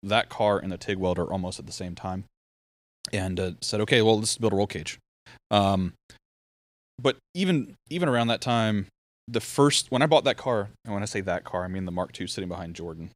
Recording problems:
none

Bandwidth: 15.5 kHz